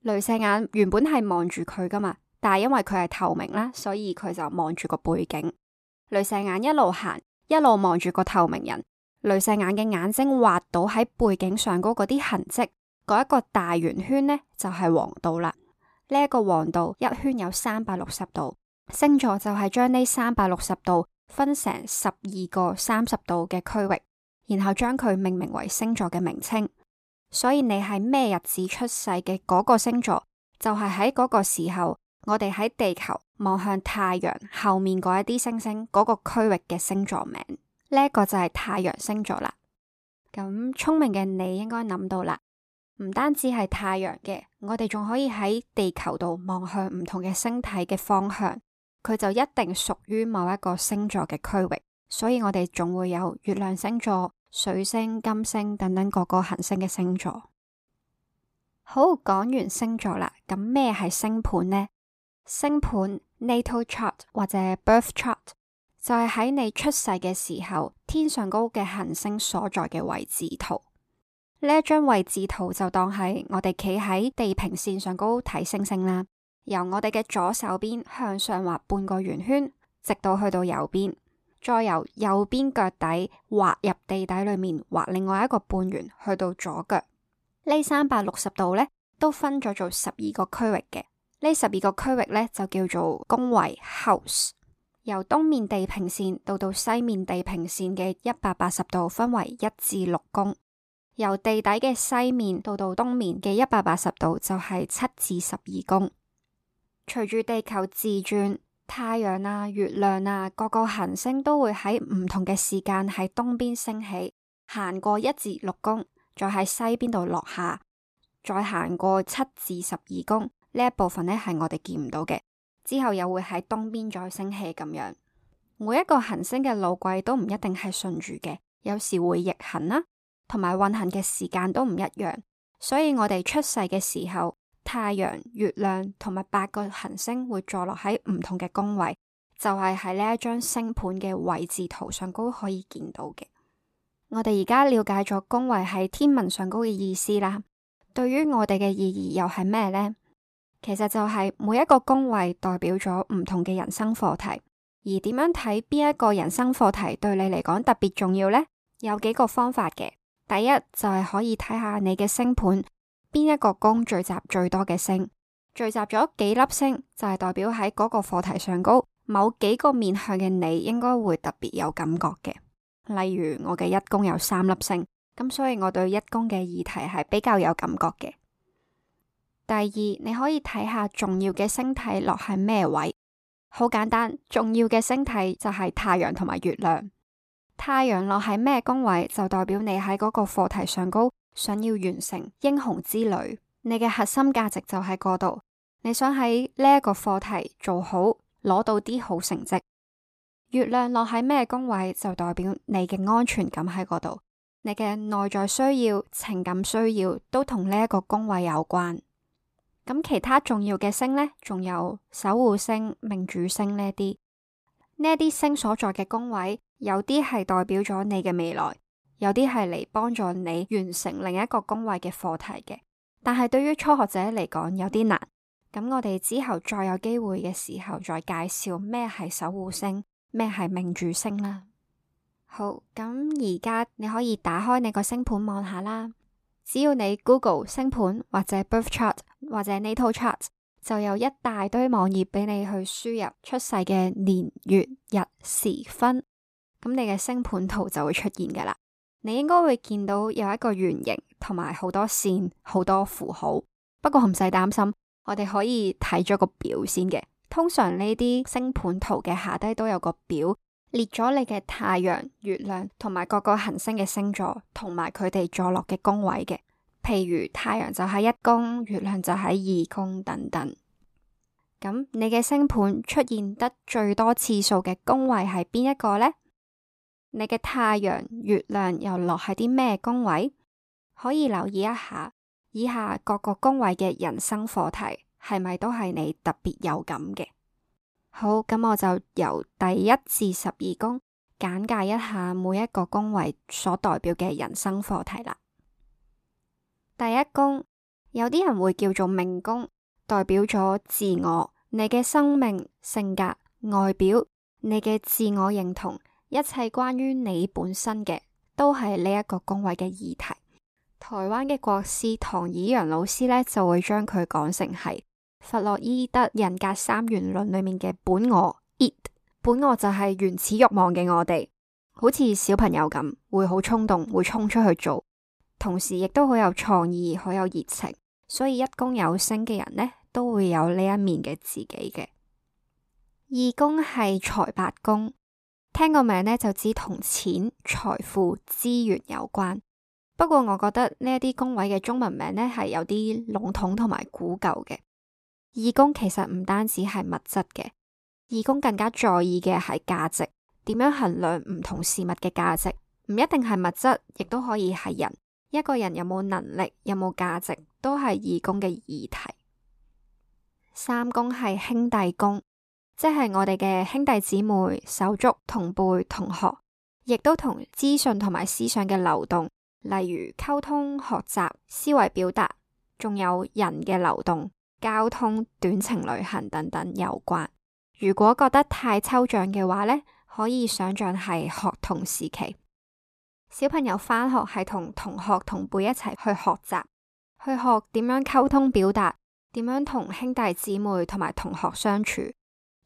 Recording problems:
none

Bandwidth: 14.5 kHz